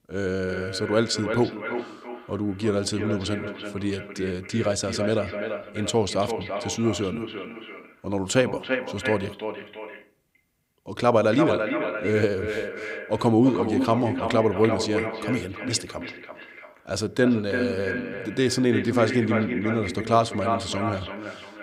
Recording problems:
echo of what is said; strong; throughout; 340 ms later, 6 dB below the speech

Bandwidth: 15.5 kHz